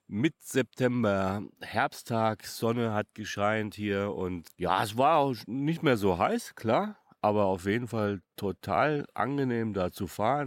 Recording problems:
abrupt cut into speech; at the end

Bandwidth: 16.5 kHz